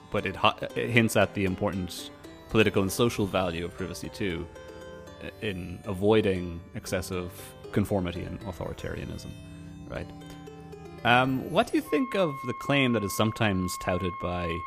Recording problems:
background music; noticeable; throughout; 15 dB below the speech

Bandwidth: 15 kHz